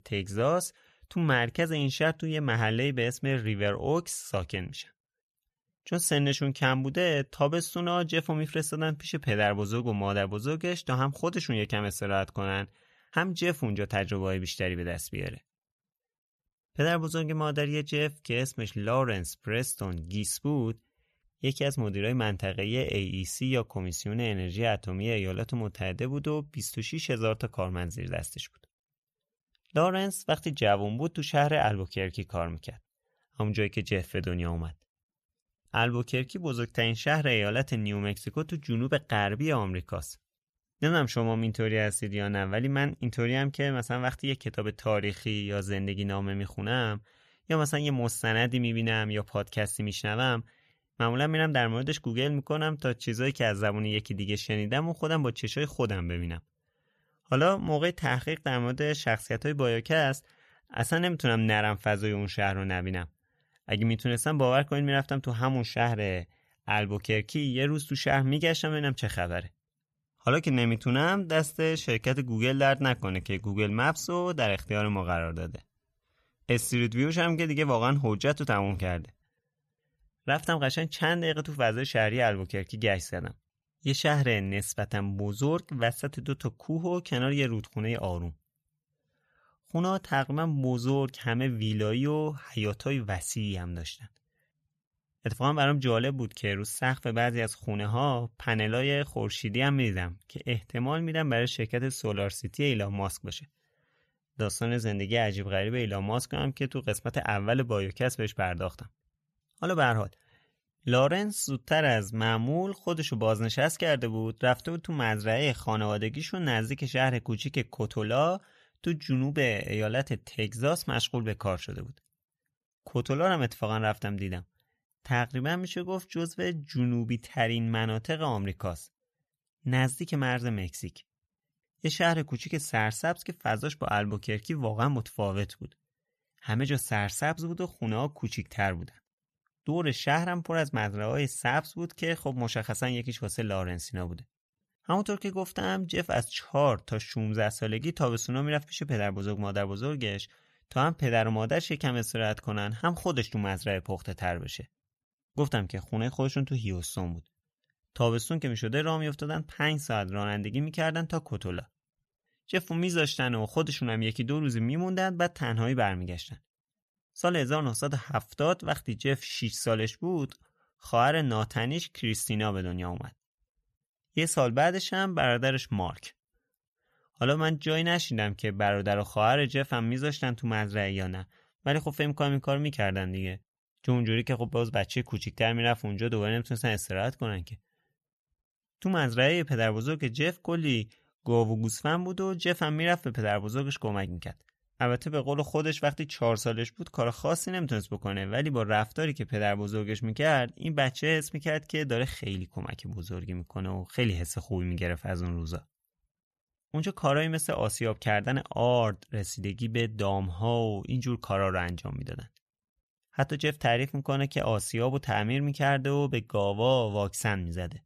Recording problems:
none

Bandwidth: 14 kHz